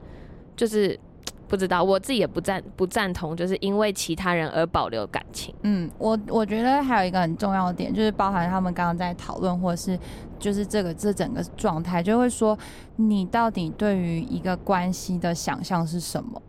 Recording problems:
wind noise on the microphone; occasional gusts; 25 dB below the speech

